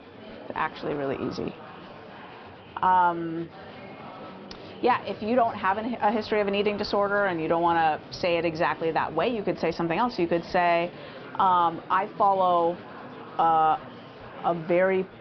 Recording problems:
high frequencies cut off; noticeable; nothing above 5.5 kHz
murmuring crowd; noticeable; throughout; 20 dB below the speech

